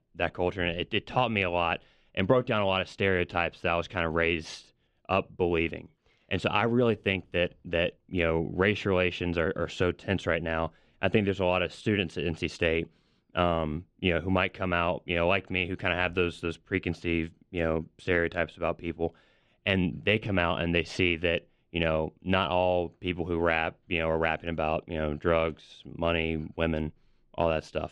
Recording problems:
muffled; slightly; fading above 3 kHz

